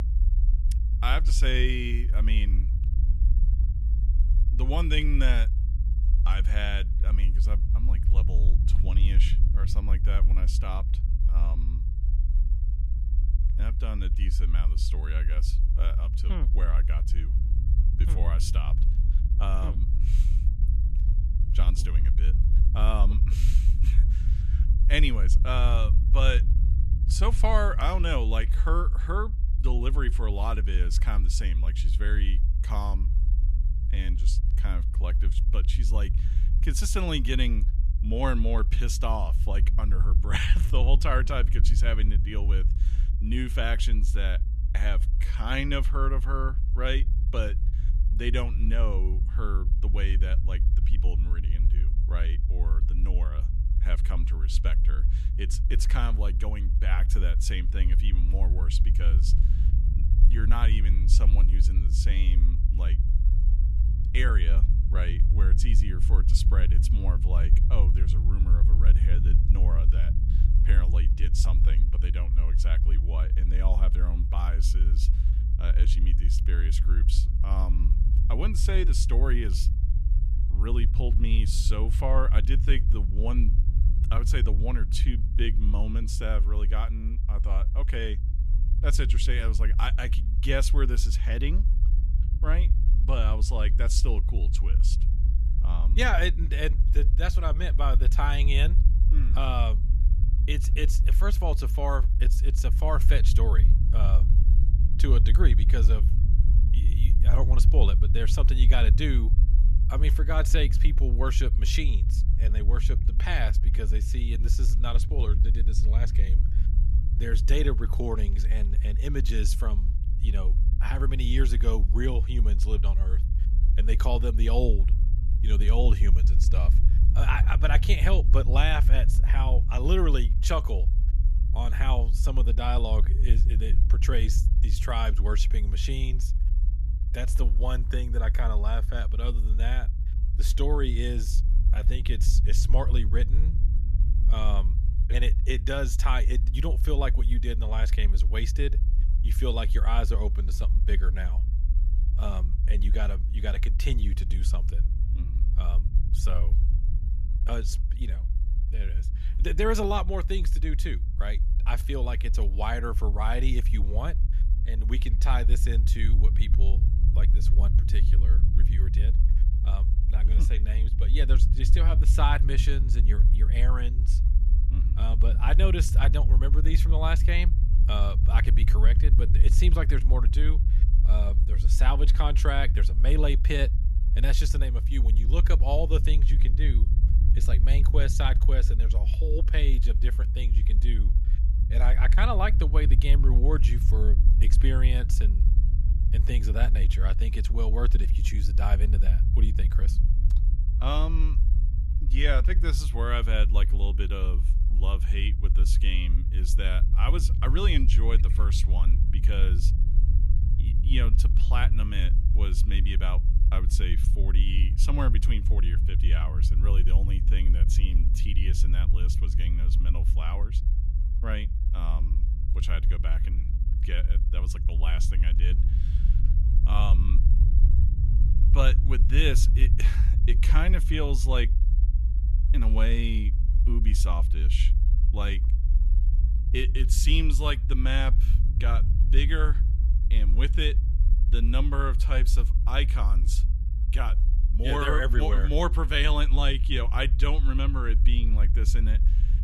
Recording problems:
low rumble; noticeable; throughout; 10 dB below the speech

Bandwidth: 13.5 kHz